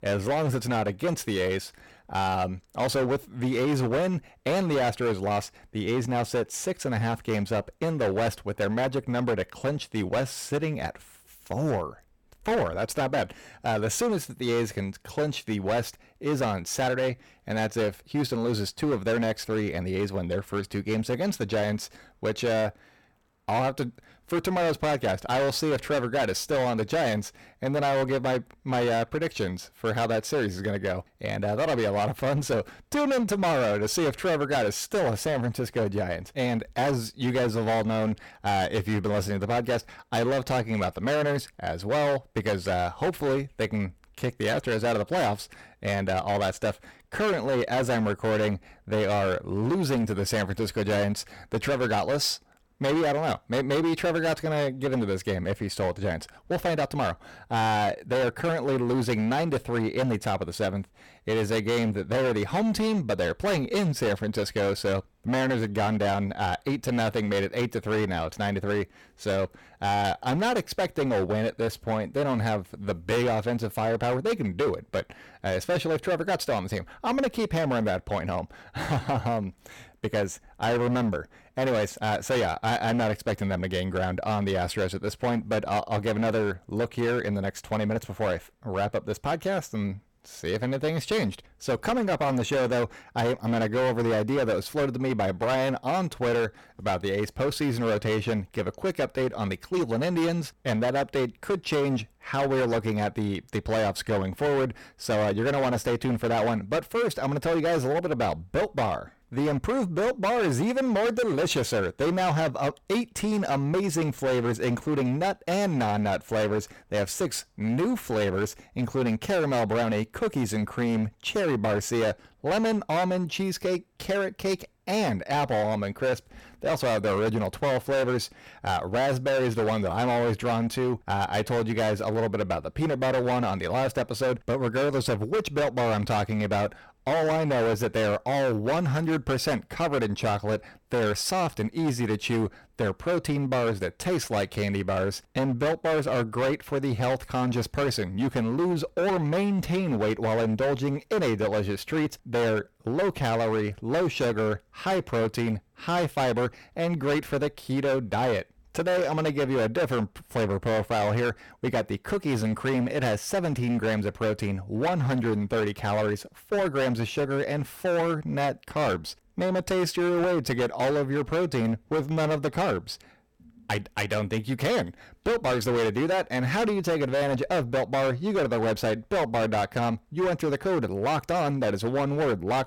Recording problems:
distortion; heavy; 19% of the sound clipped

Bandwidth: 17.5 kHz